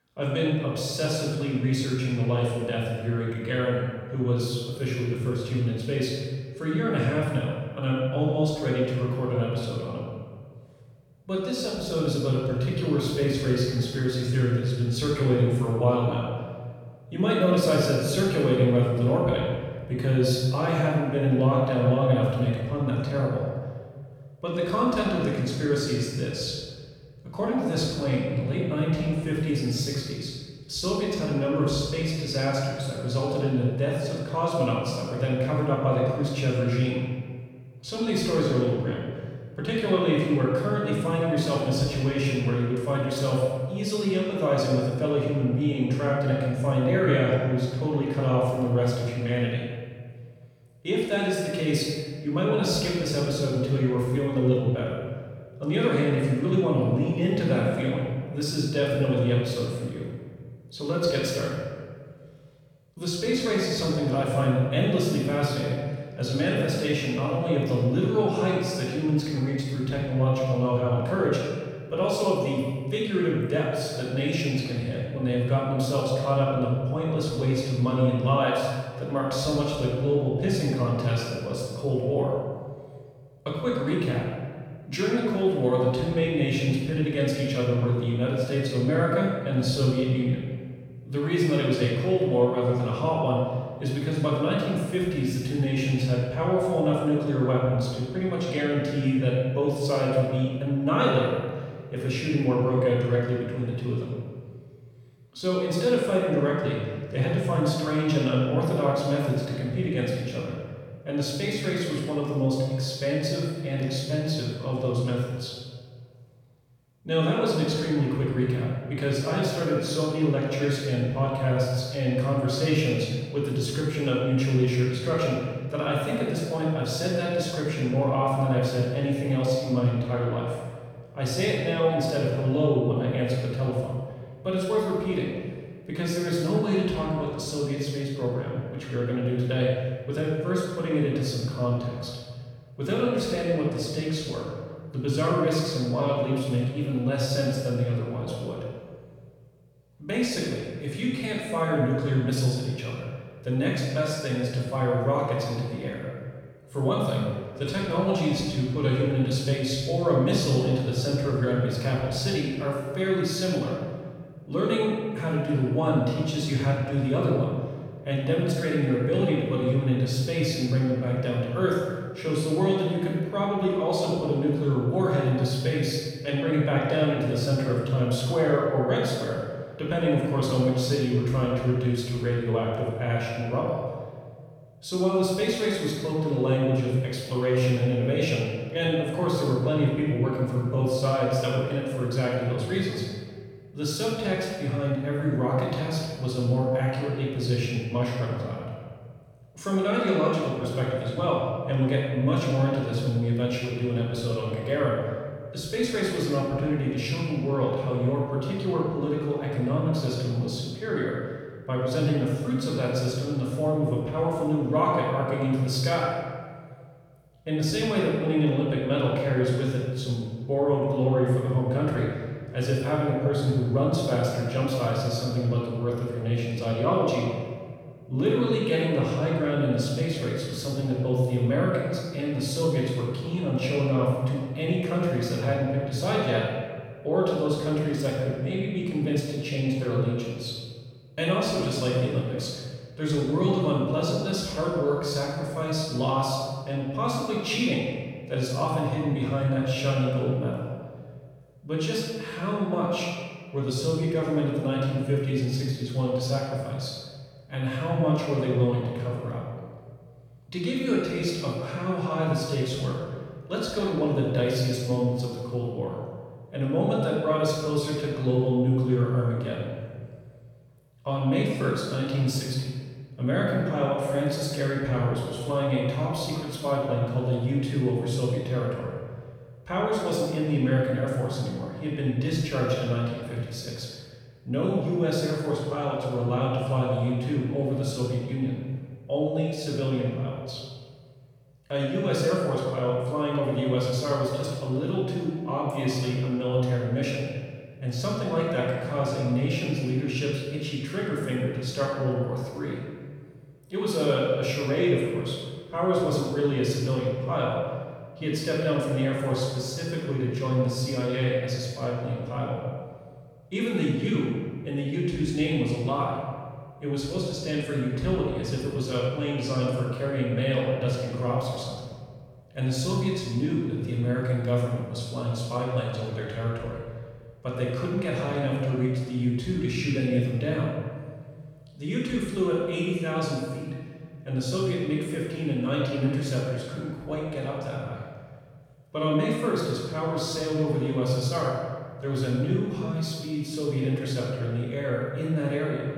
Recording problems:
room echo; strong; dies away in 1.5 s
off-mic speech; far

